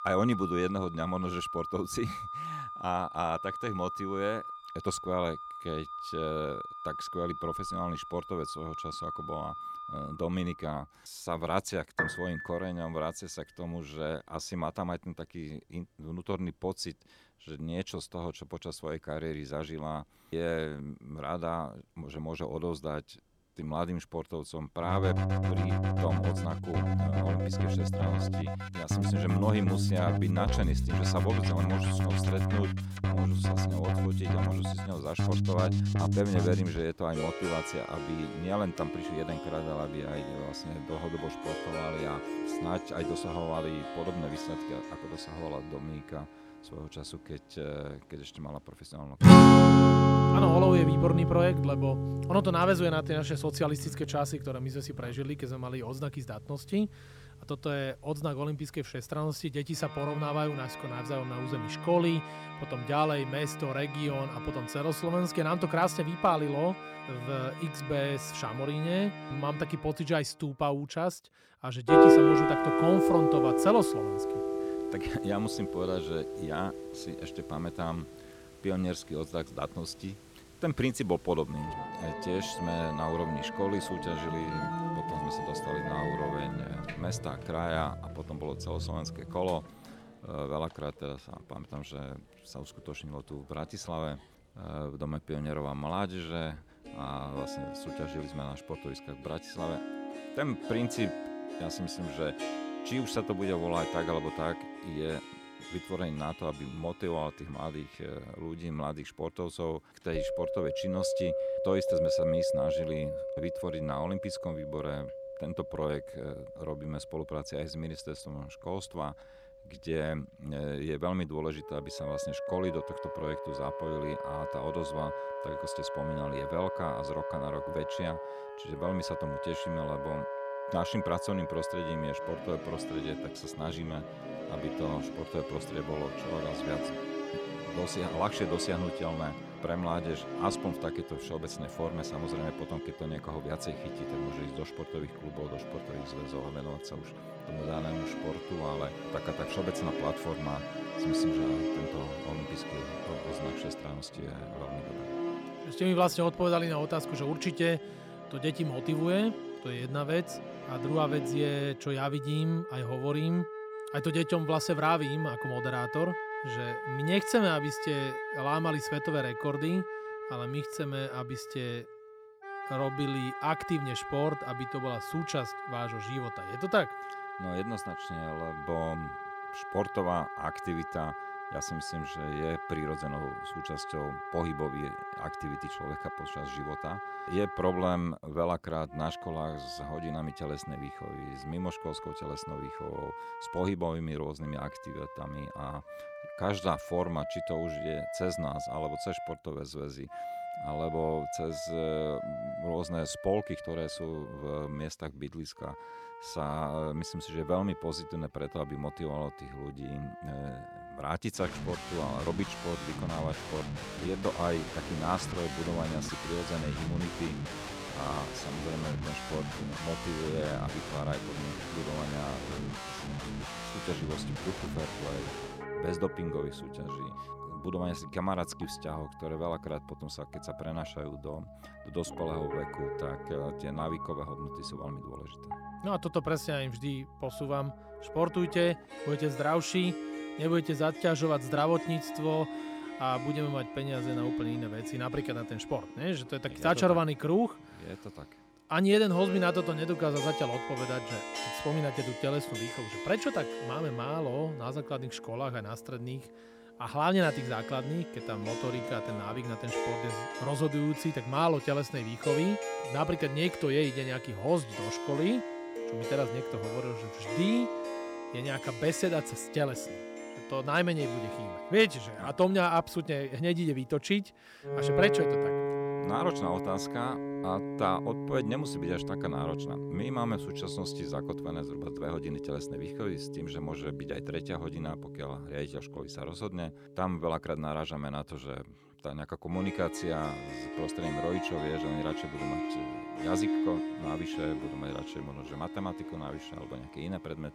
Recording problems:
background music; very loud; throughout; 1 dB above the speech

